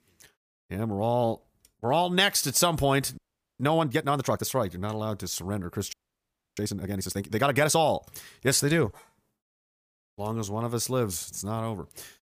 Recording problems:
audio freezing; at 3 s and at 6 s for 0.5 s

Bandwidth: 15 kHz